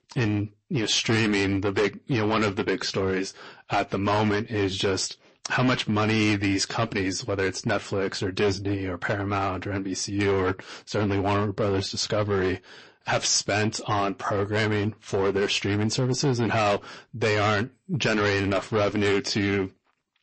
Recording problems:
distortion; heavy; 9% of the sound clipped
garbled, watery; slightly; nothing above 8 kHz

